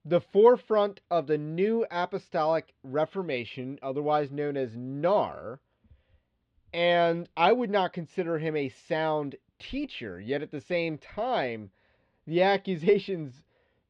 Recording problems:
muffled; slightly; fading above 3.5 kHz

